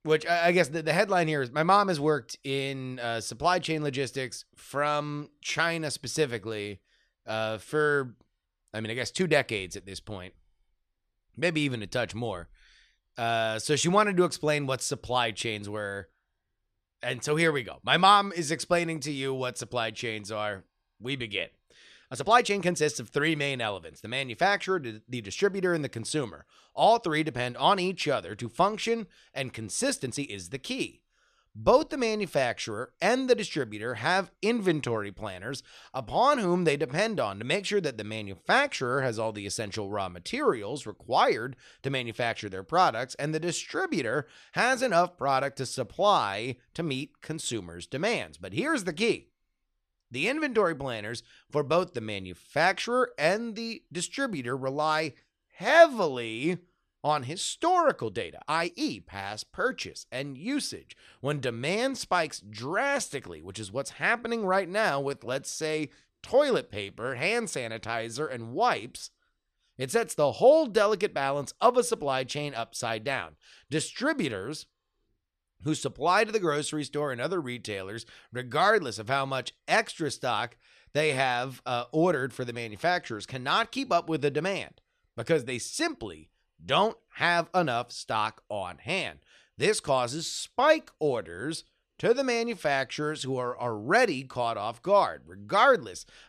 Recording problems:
uneven, jittery; strongly; from 4.5 s to 1:06

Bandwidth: 14 kHz